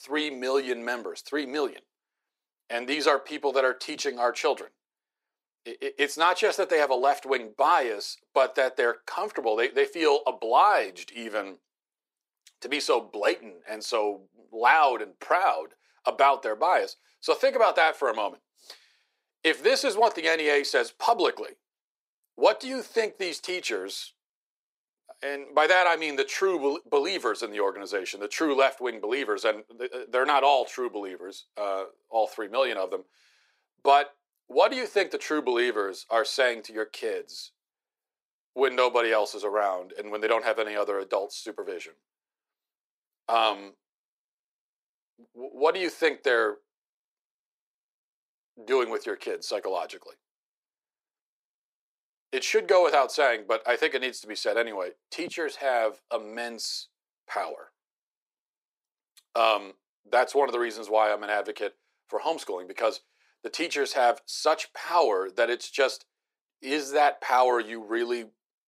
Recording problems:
thin; somewhat; fading below 350 Hz

